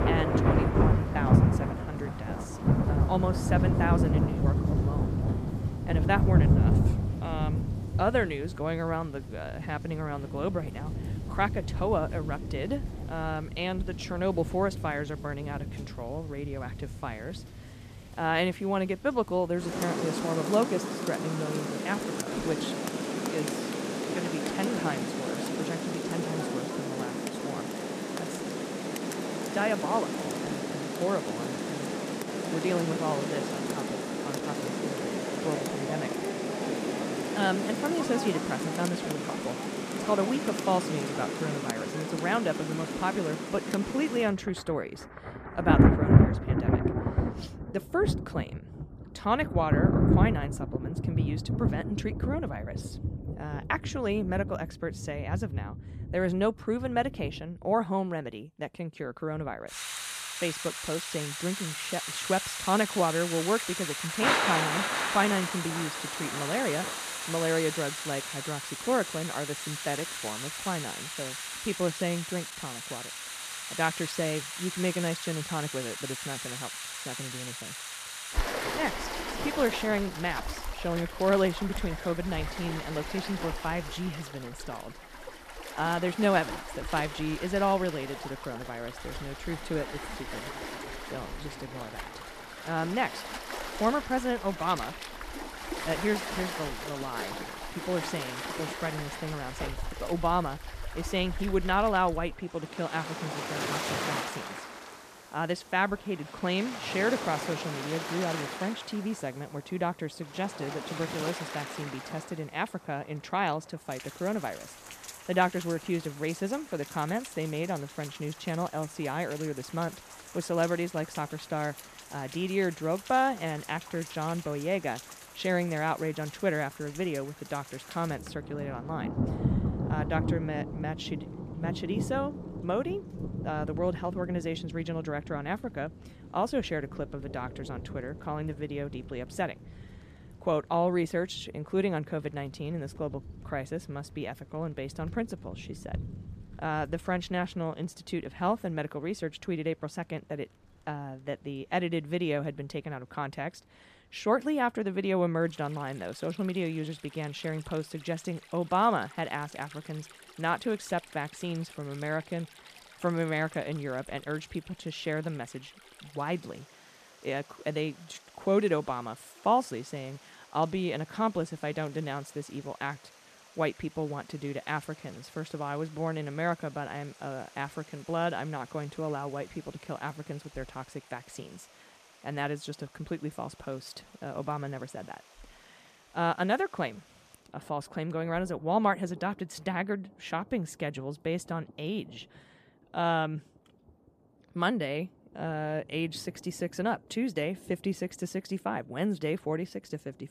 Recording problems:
rain or running water; very loud; throughout; as loud as the speech

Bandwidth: 14.5 kHz